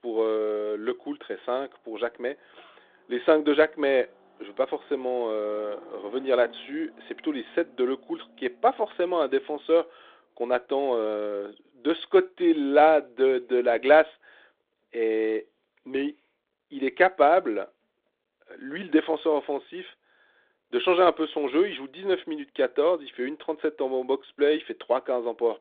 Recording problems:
phone-call audio
traffic noise; faint; throughout; 30 dB below the speech

